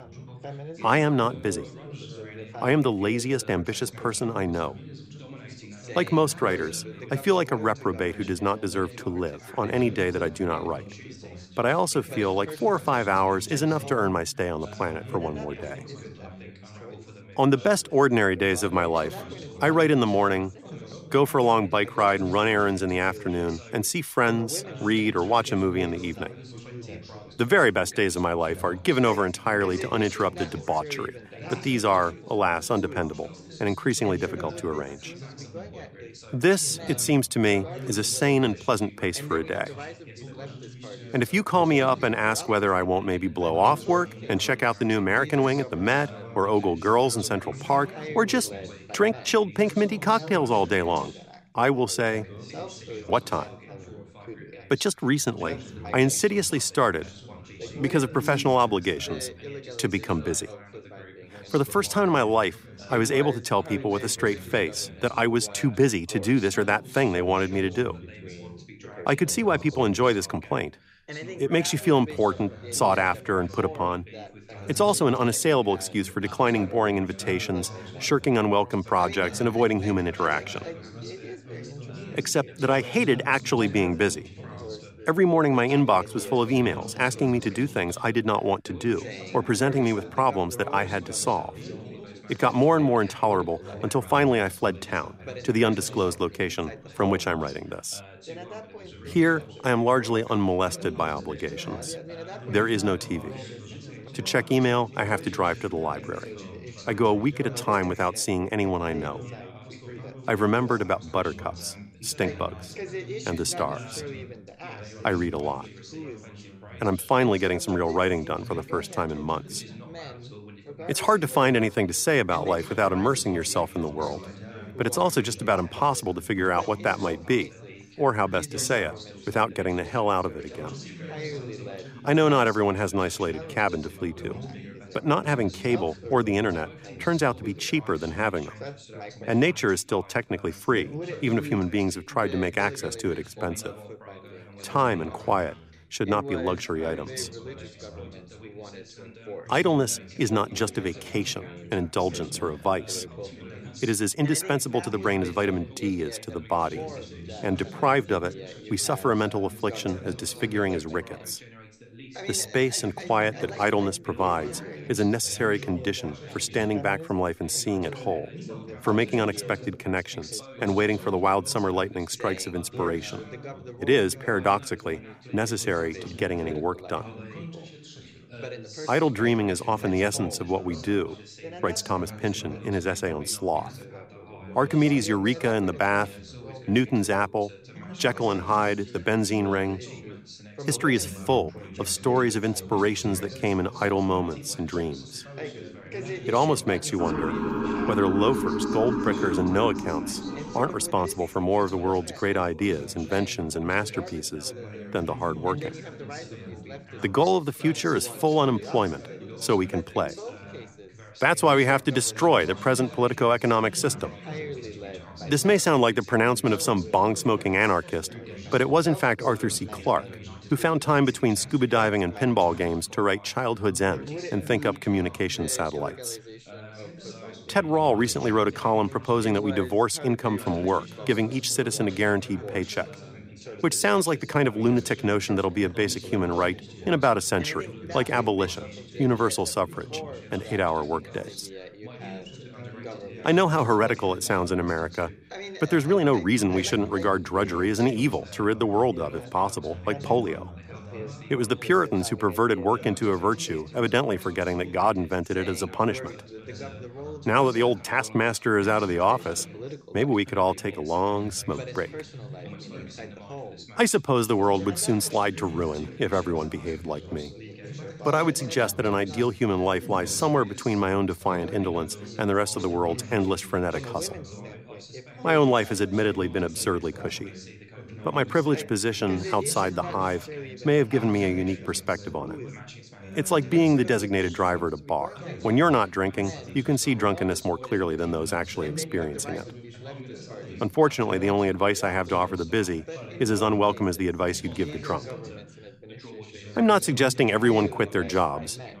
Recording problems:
background chatter; noticeable; throughout; 3 voices, 15 dB below the speech
siren; noticeable; from 3:17 to 3:21; peak 2 dB below the speech

